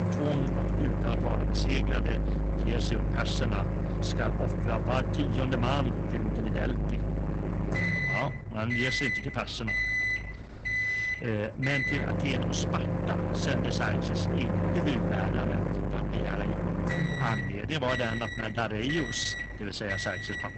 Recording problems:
garbled, watery; badly; nothing above 7.5 kHz
distortion; slight; 10 dB below the speech
household noises; very loud; throughout; 2 dB above the speech

